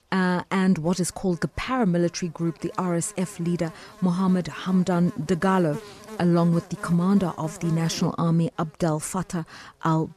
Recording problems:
electrical hum; noticeable; throughout; 60 Hz, 15 dB below the speech

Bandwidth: 14 kHz